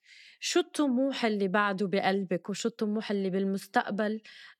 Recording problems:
none

